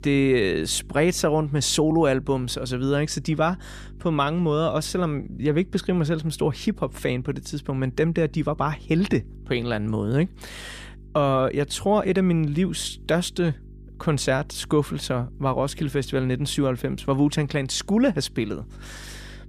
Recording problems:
electrical hum; faint; throughout; 50 Hz, 30 dB below the speech

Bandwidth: 14.5 kHz